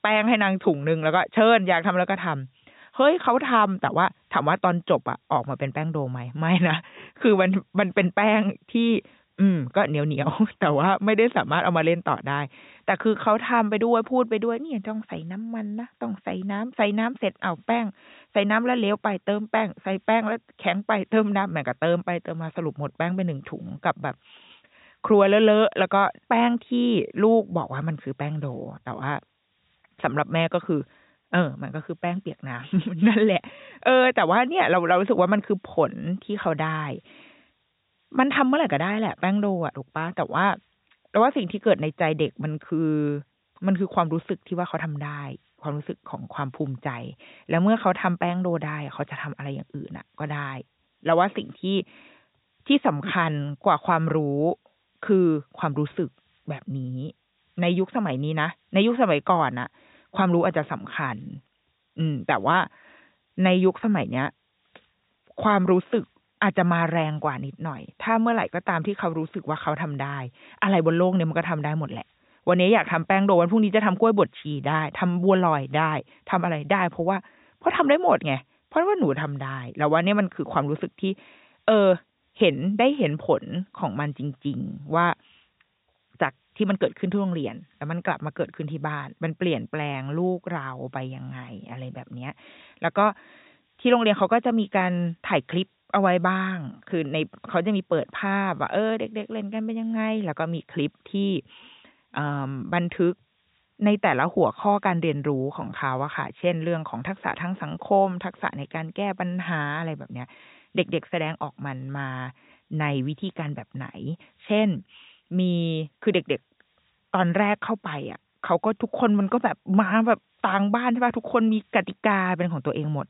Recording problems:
high frequencies cut off; severe; nothing above 4 kHz
hiss; very faint; throughout; 45 dB below the speech

